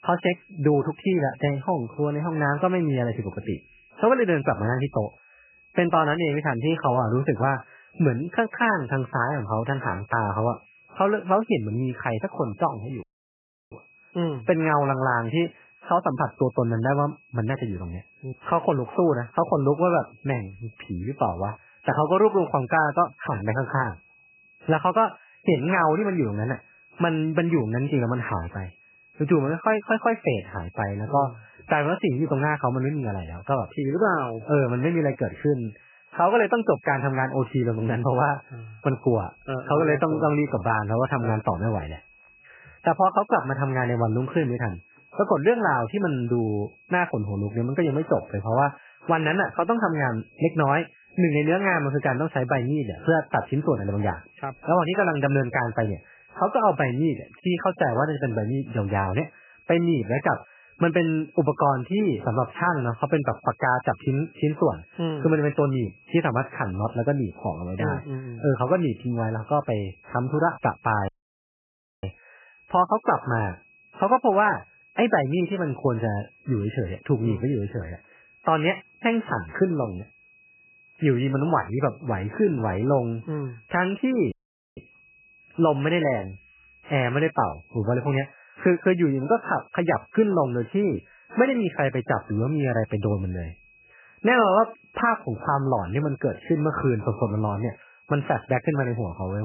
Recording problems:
garbled, watery; badly; nothing above 3 kHz
high-pitched whine; faint; throughout; 2.5 kHz, 30 dB below the speech
audio cutting out; at 13 s for 0.5 s, at 1:11 for 1 s and at 1:24
abrupt cut into speech; at the end

